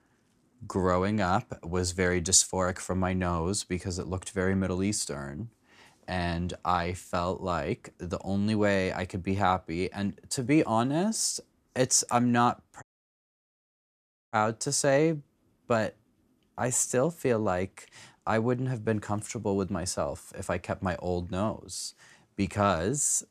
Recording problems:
audio cutting out; at 13 s for 1.5 s

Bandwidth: 15 kHz